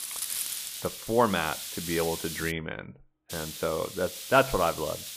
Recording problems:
high frequencies cut off; severe; nothing above 4 kHz
hiss; loud; until 2.5 s and from 3.5 s on; 6 dB below the speech

